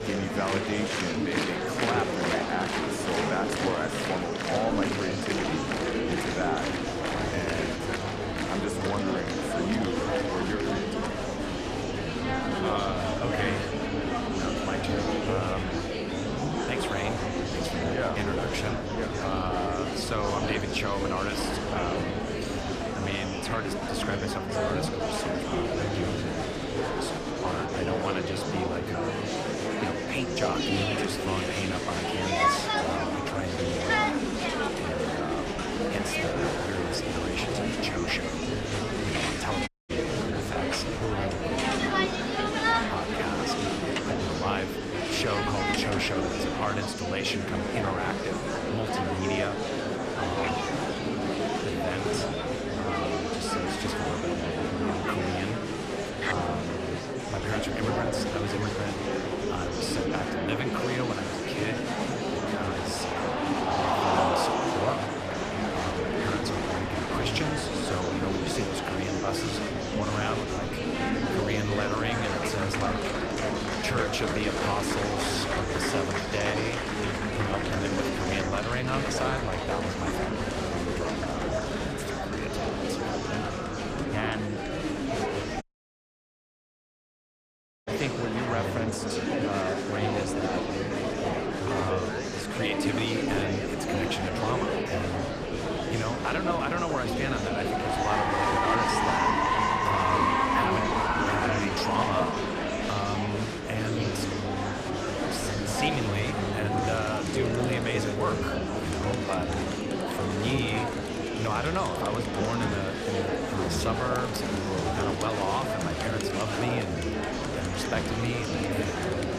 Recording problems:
murmuring crowd; very loud; throughout; 4 dB above the speech
audio cutting out; at 40 s and at 1:26 for 2 s

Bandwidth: 14.5 kHz